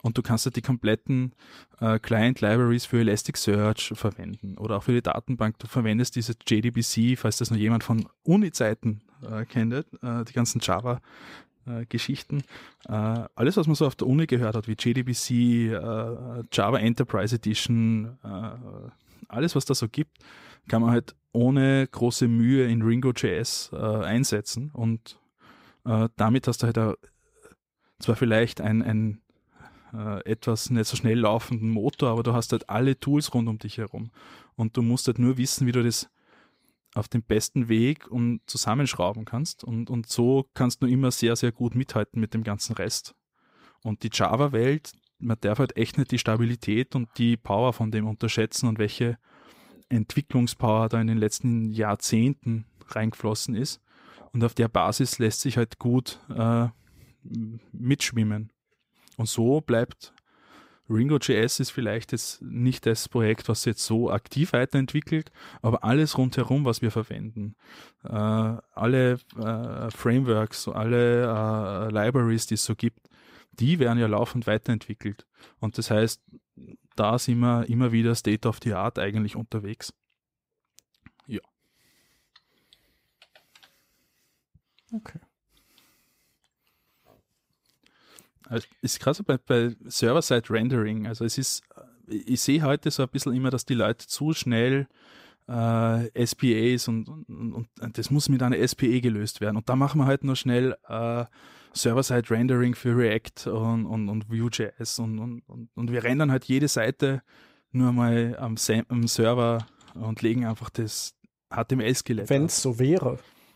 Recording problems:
none

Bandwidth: 15.5 kHz